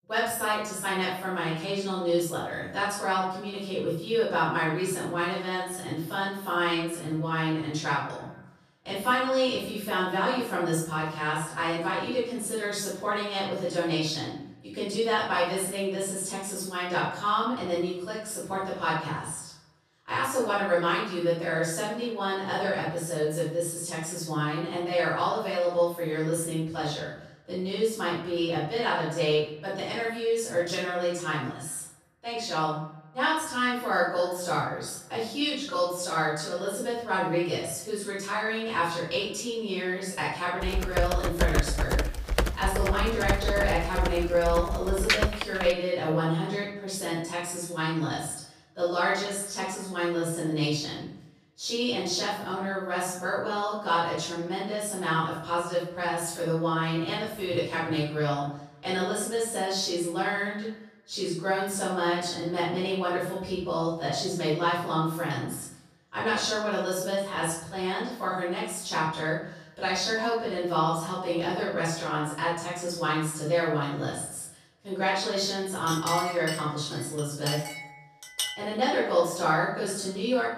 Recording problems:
off-mic speech; far
room echo; noticeable; dies away in 0.6 s
echo of what is said; faint; throughout; 150 ms later, 25 dB below the speech
keyboard typing; loud; from 41 to 46 s; peak 4 dB above the speech
clattering dishes; noticeable; from 1:16 to 1:19; peak 2 dB below the speech

